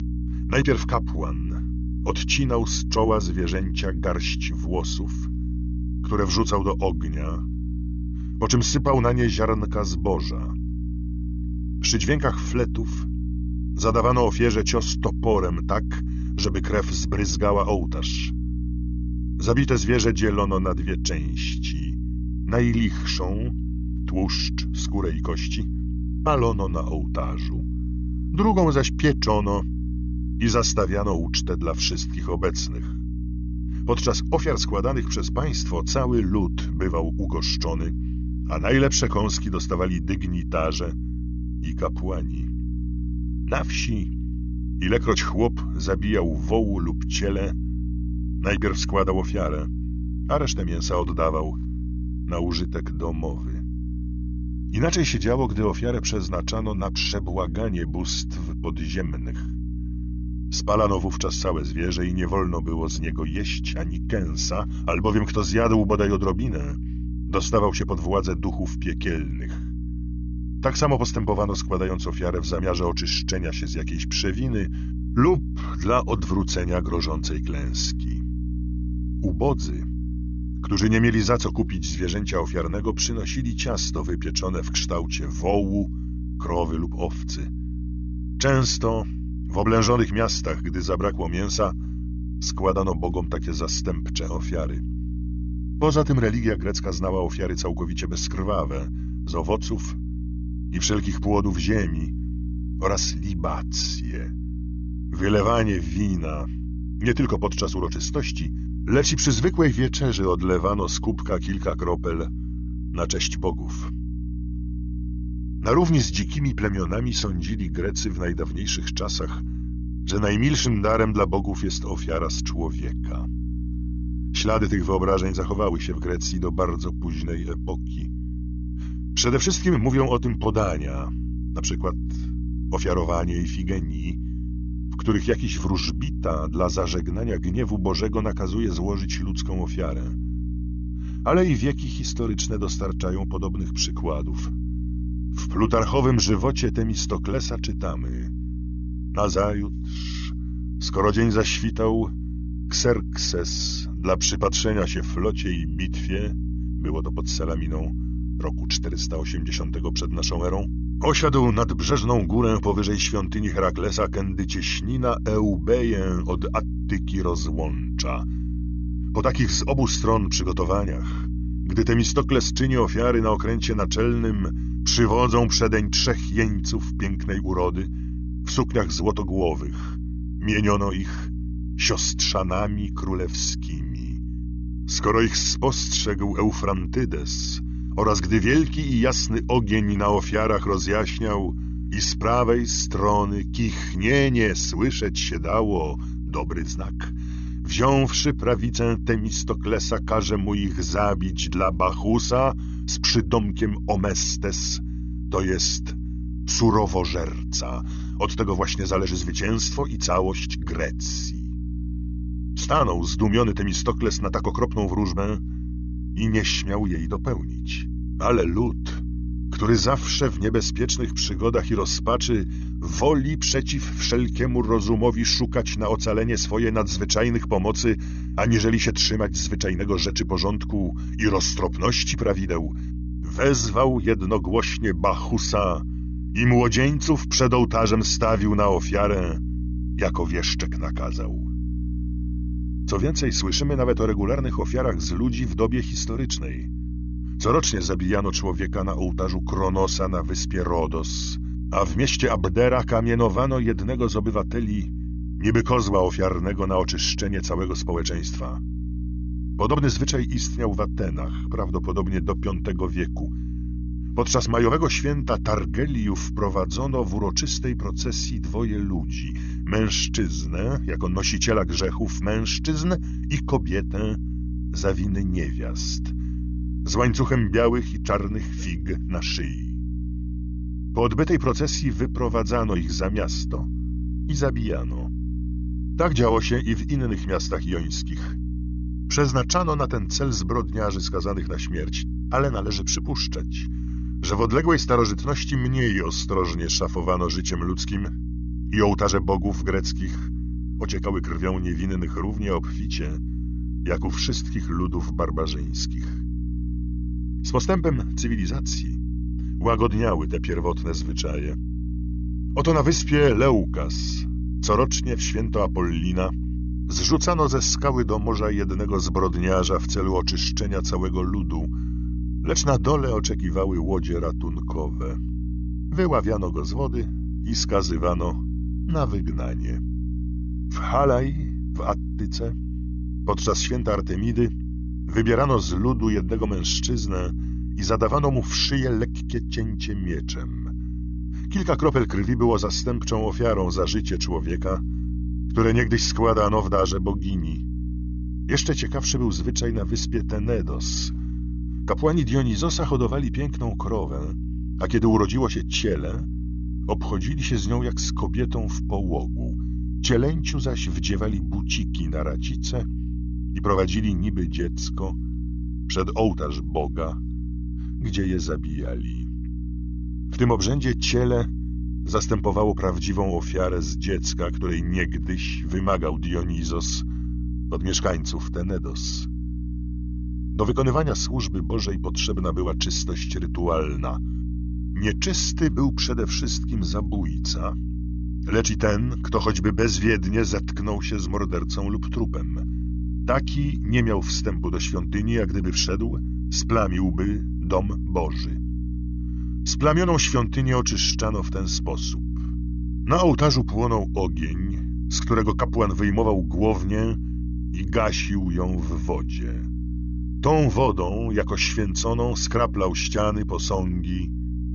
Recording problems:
high frequencies cut off; noticeable; nothing above 6.5 kHz
electrical hum; noticeable; throughout; 60 Hz, 15 dB below the speech

